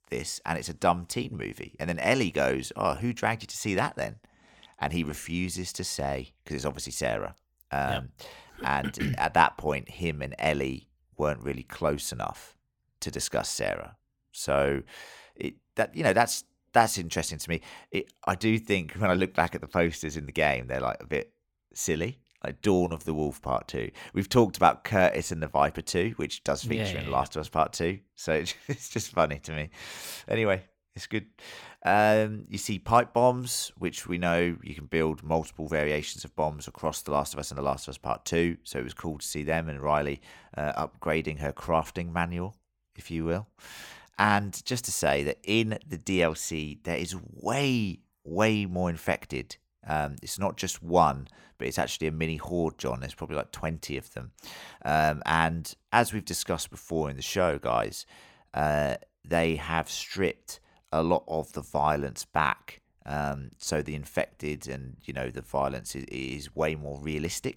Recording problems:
none

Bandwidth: 17 kHz